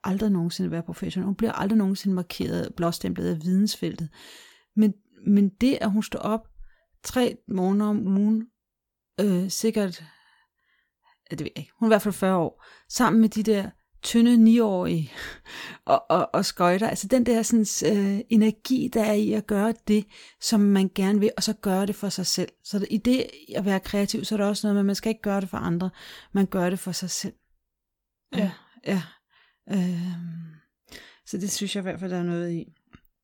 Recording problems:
none

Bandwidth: 18.5 kHz